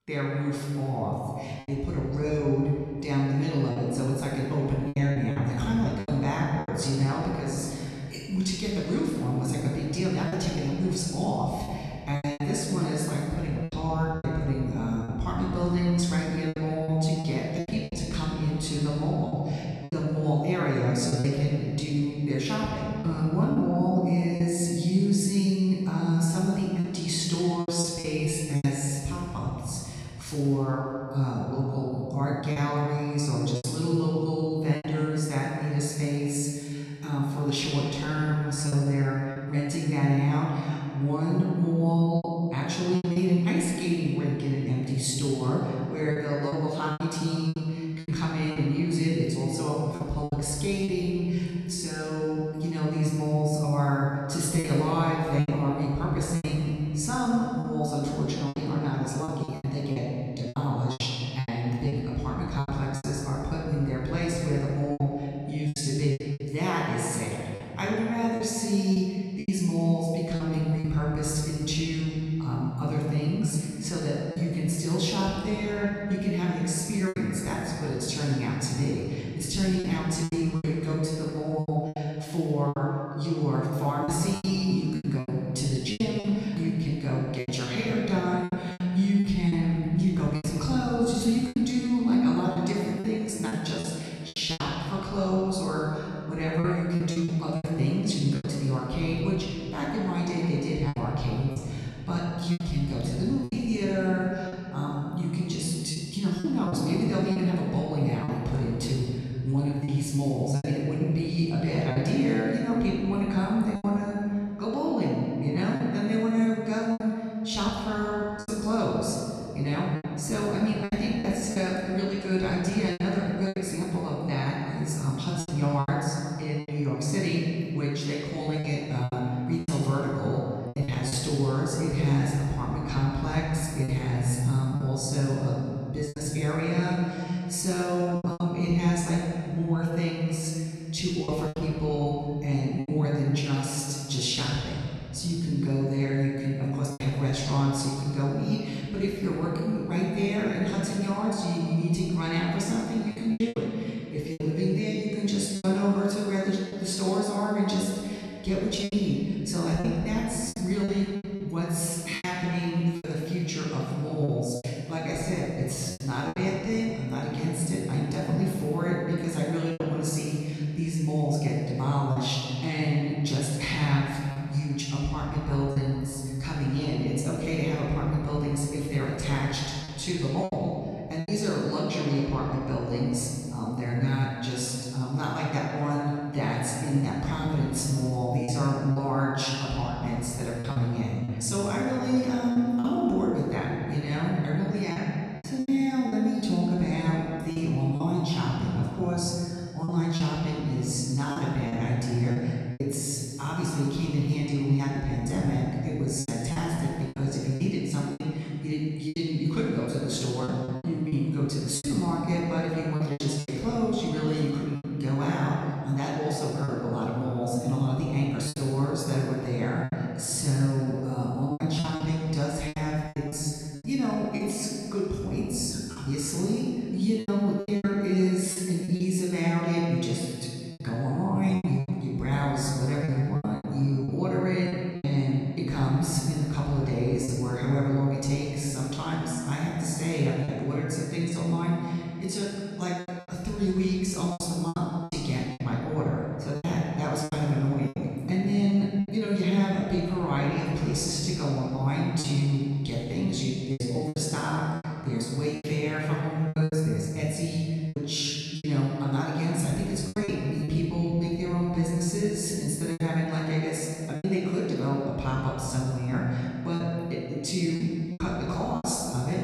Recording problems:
room echo; strong; dies away in 2.6 s
off-mic speech; far
choppy; very; 6% of the speech affected

